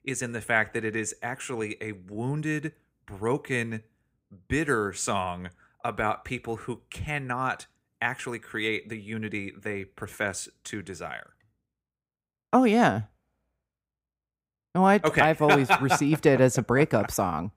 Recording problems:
none

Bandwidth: 15.5 kHz